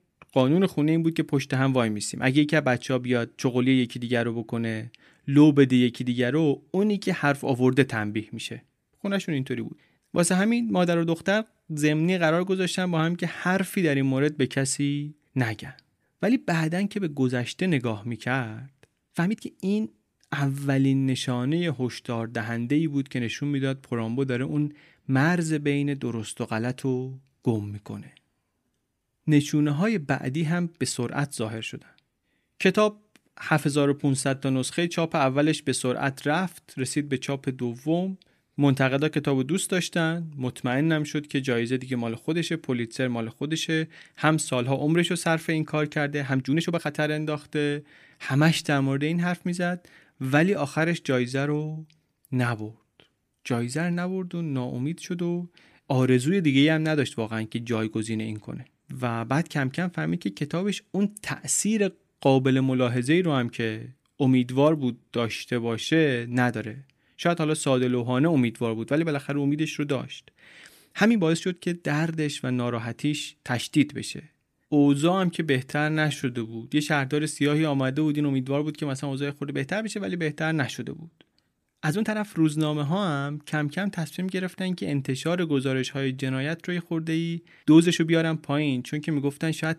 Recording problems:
uneven, jittery; strongly; from 6.5 s to 1:28

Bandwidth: 15 kHz